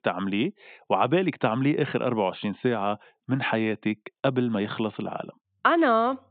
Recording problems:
high frequencies cut off; severe; nothing above 4 kHz

